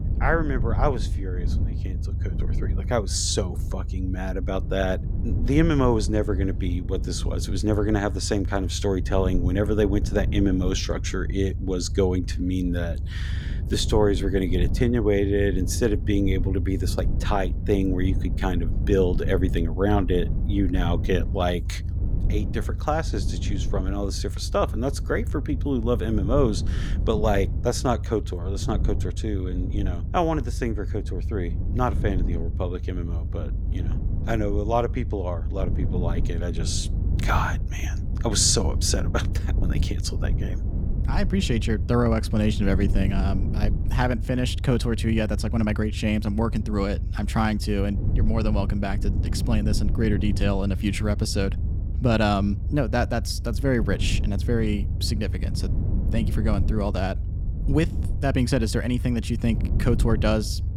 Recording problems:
low rumble; noticeable; throughout; 15 dB below the speech

